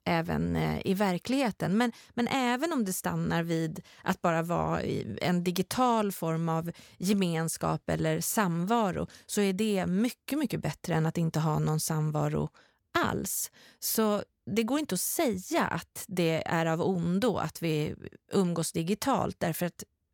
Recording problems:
none

